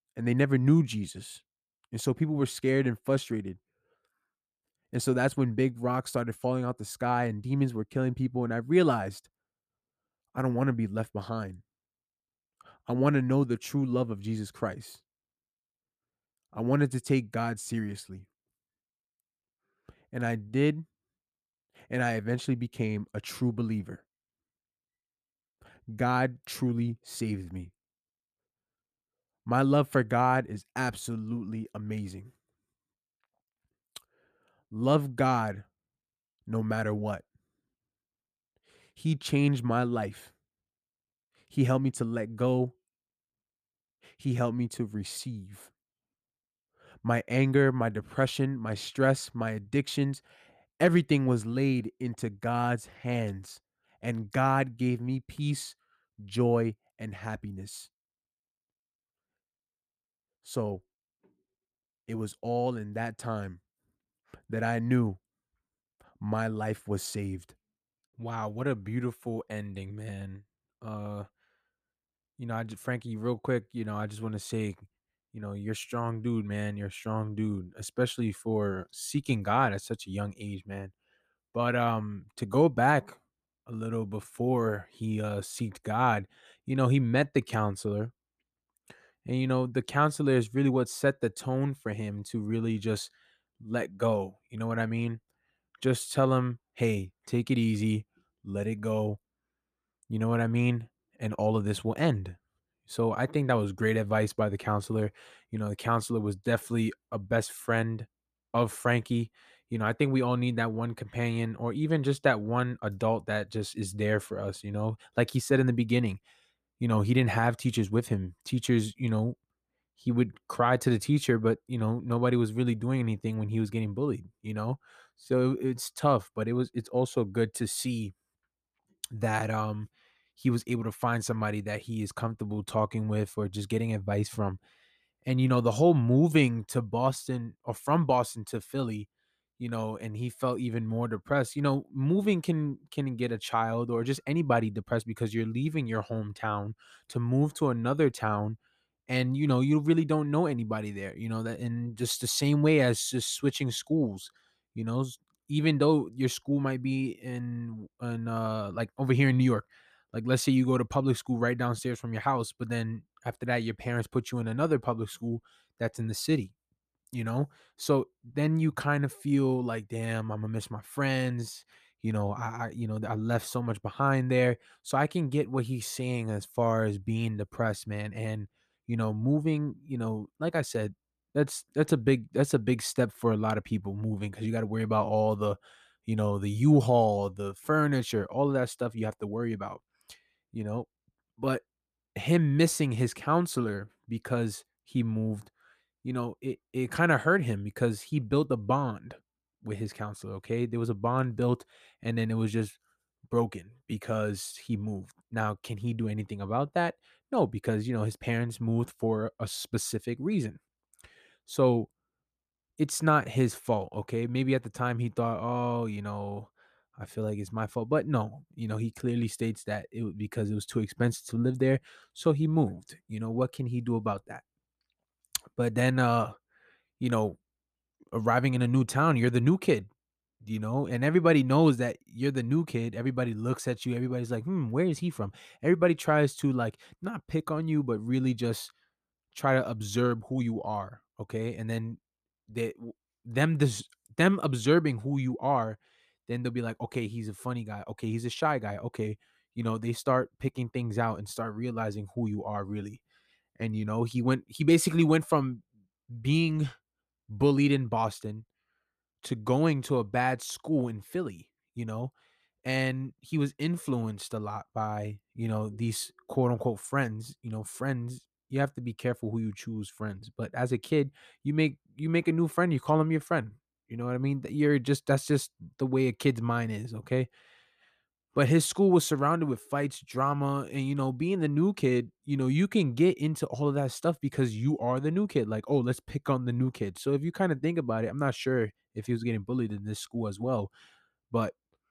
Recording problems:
none

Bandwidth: 14.5 kHz